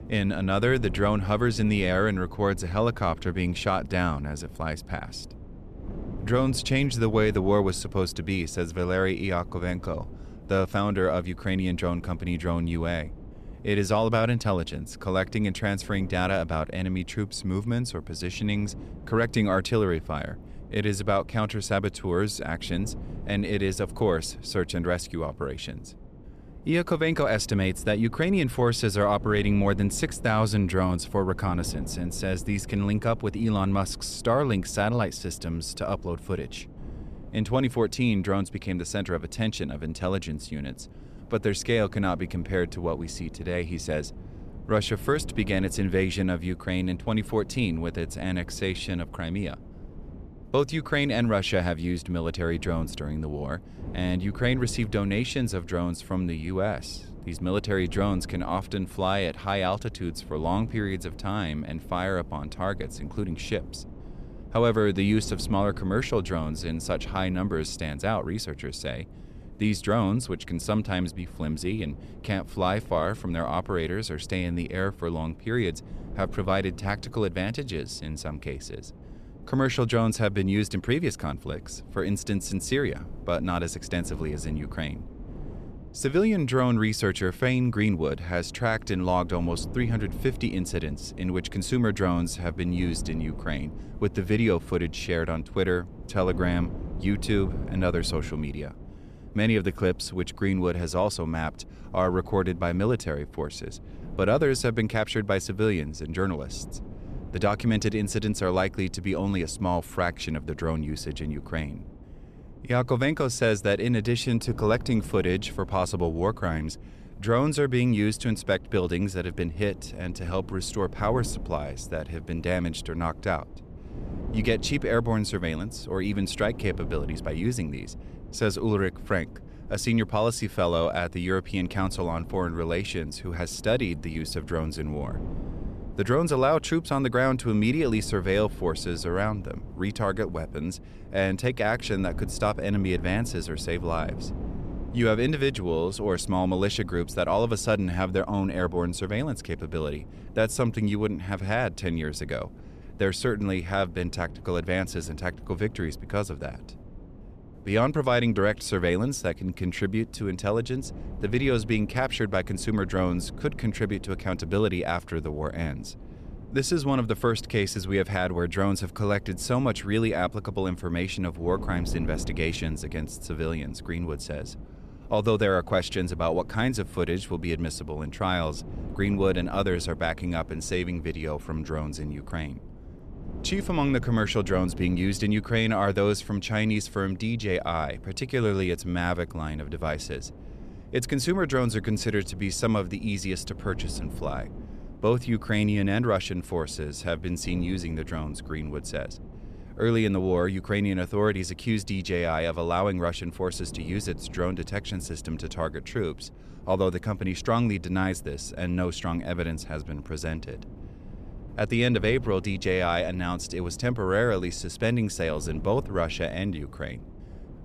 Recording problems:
wind noise on the microphone; occasional gusts; 20 dB below the speech

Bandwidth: 14 kHz